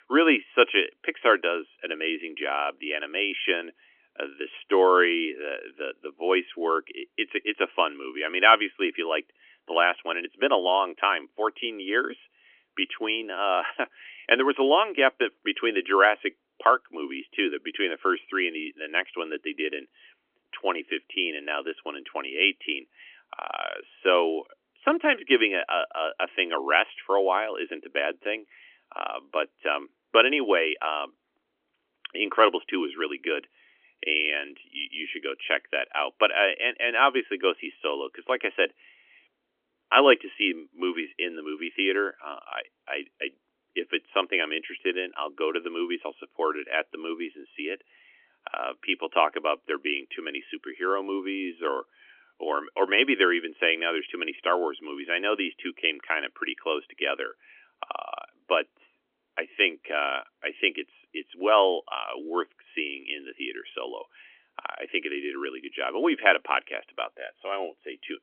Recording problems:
phone-call audio; nothing above 3.5 kHz

